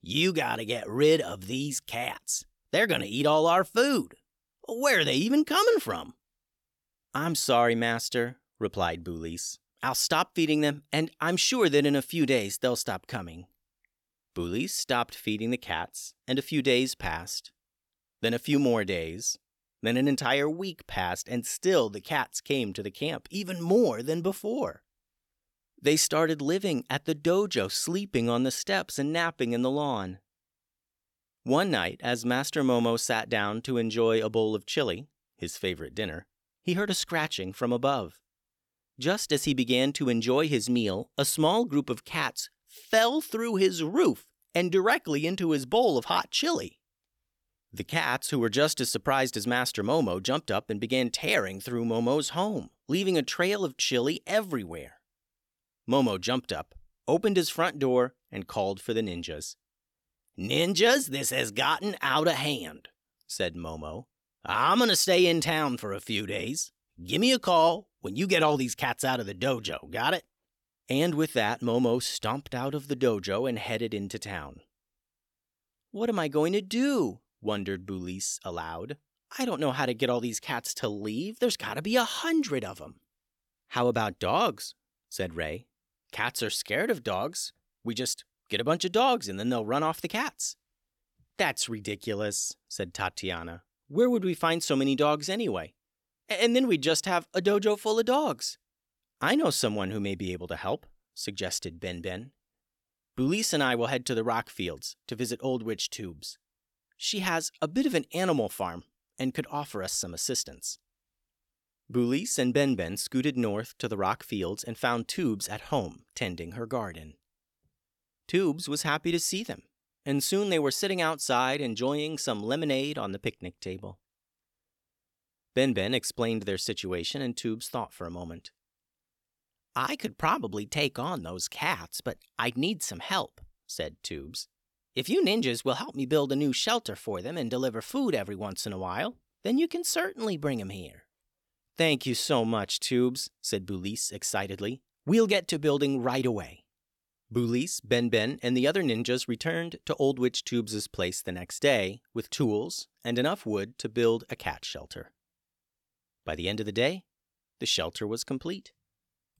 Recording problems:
none

